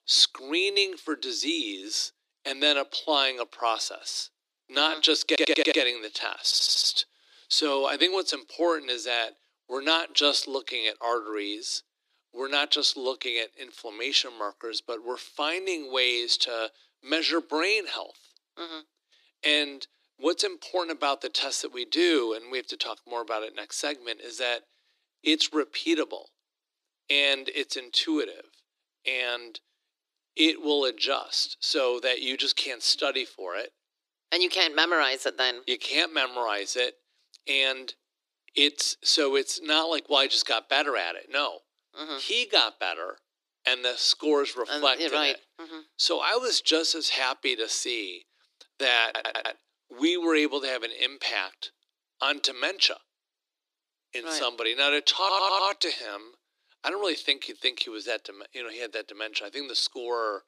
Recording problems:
thin; very; fading below 300 Hz
audio stuttering; 4 times, first at 5.5 s

